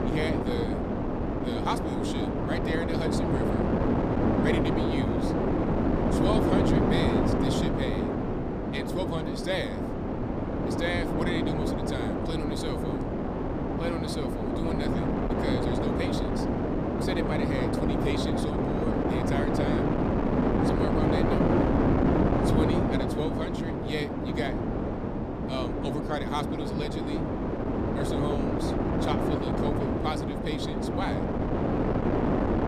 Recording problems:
wind noise on the microphone; heavy; 5 dB above the speech

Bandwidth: 15 kHz